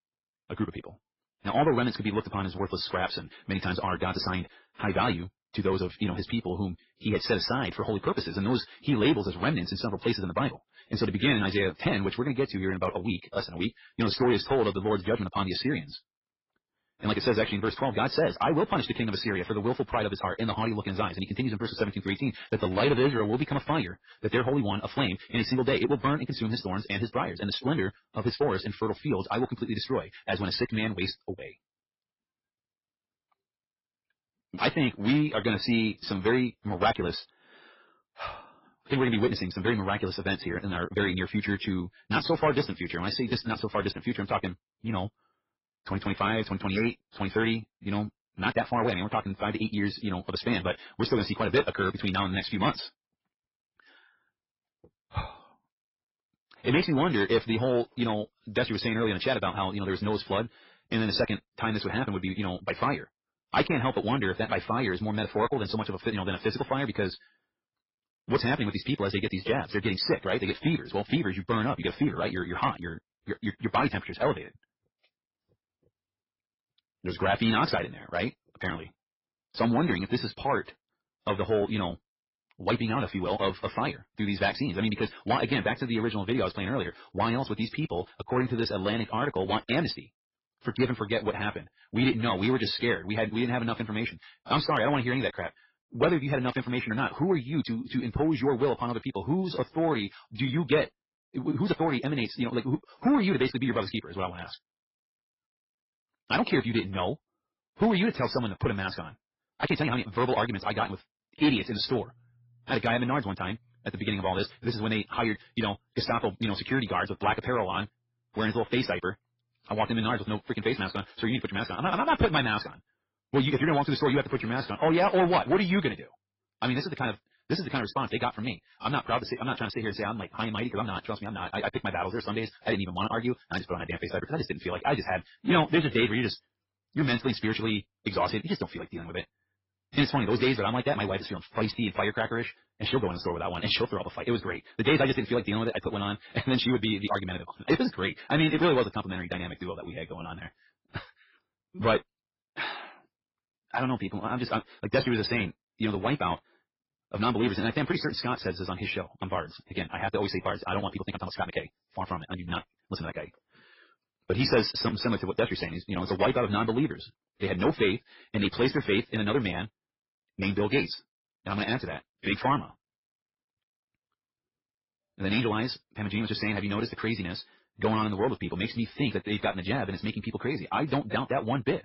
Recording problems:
garbled, watery; badly; nothing above 5.5 kHz
wrong speed, natural pitch; too fast; 1.7 times normal speed
distortion; slight; 1.9% of the sound clipped
uneven, jittery; strongly; from 5.5 s to 2:43

